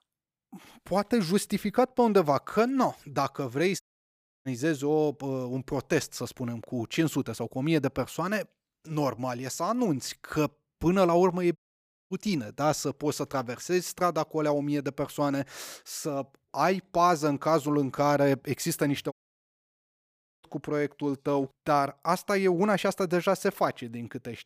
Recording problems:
audio cutting out; at 4 s for 0.5 s, at 12 s for 0.5 s and at 19 s for 1.5 s

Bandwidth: 15 kHz